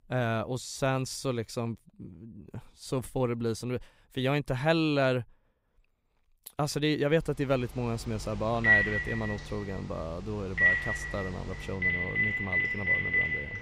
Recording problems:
alarms or sirens; very loud; from 7.5 s on; 5 dB above the speech

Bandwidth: 15.5 kHz